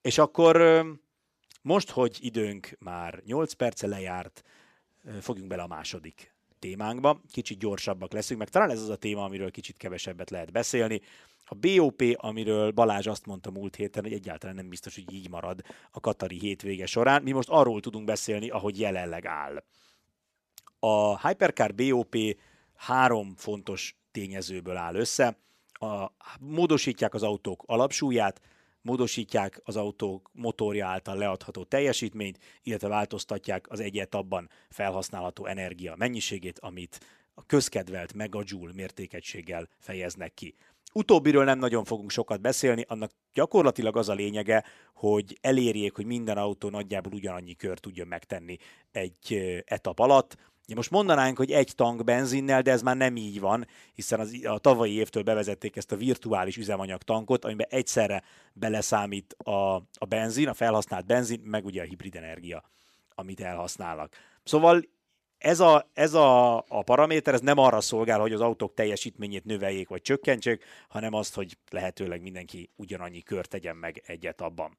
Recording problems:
none

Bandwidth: 14 kHz